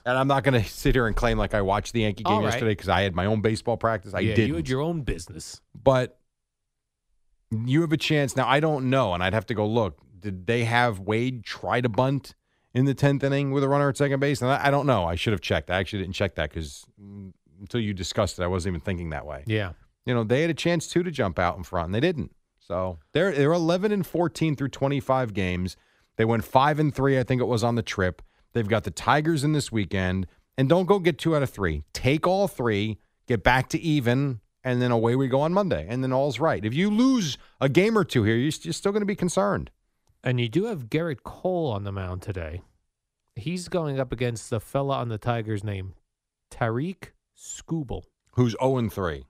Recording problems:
none

